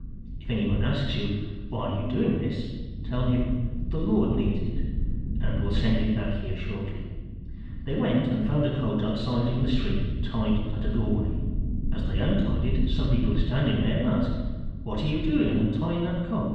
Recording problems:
off-mic speech; far
room echo; noticeable; dies away in 1.2 s
muffled; slightly; fading above 3.5 kHz
low rumble; noticeable; throughout; 15 dB below the speech

